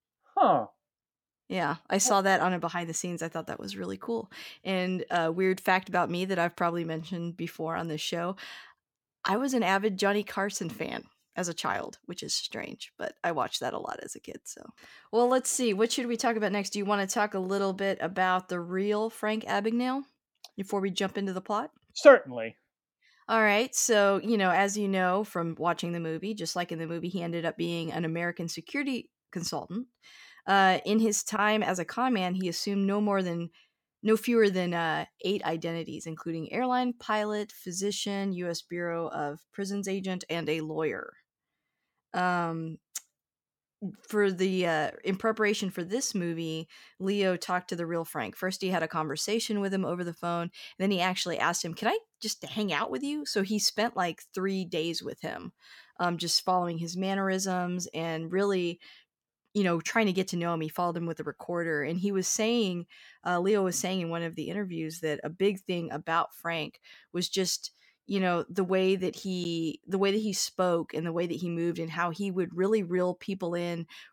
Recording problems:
none

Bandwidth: 17 kHz